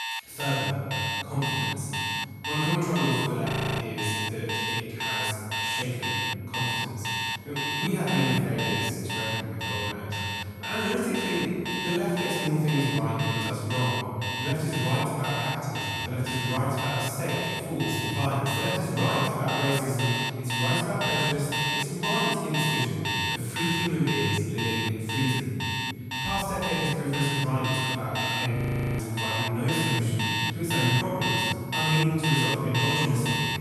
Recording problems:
room echo; strong; dies away in 2.6 s
off-mic speech; far
alarms or sirens; loud; throughout; 1 dB below the speech
high-pitched whine; faint; throughout; 2 kHz, 25 dB below the speech
audio freezing; at 3.5 s and at 29 s

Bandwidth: 14.5 kHz